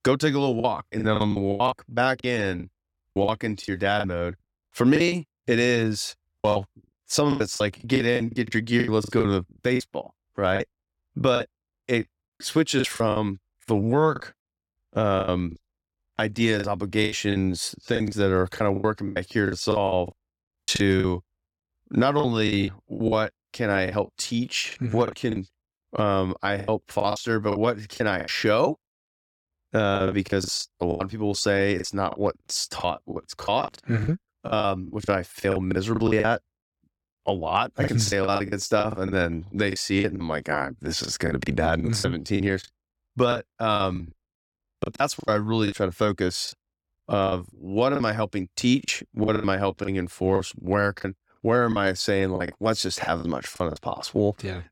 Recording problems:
choppy; very; 14% of the speech affected

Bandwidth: 17 kHz